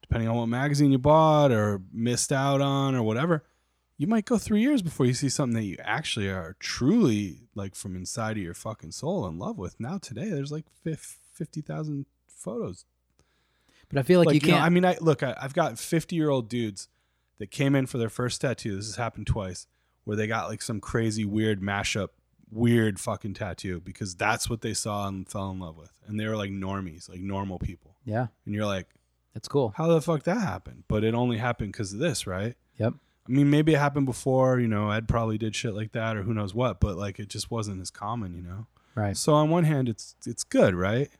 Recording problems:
none

